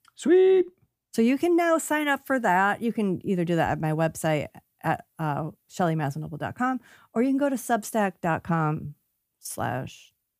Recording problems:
none

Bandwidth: 15 kHz